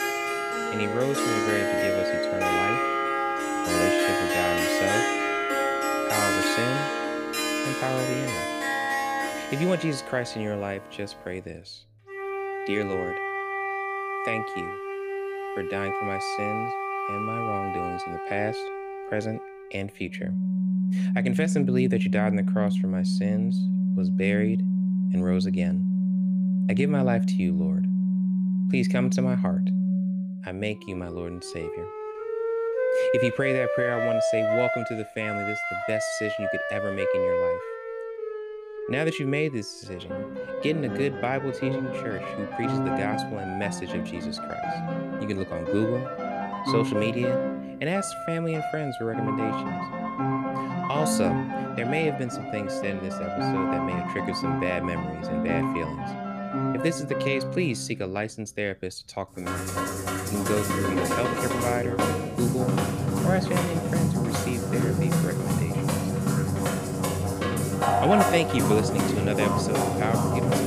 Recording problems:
background music; very loud; throughout; 3 dB above the speech

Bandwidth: 15 kHz